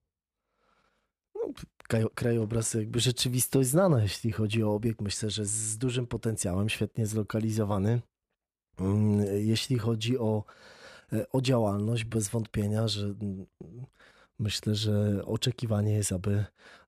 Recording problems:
uneven, jittery; slightly; from 2 to 14 s

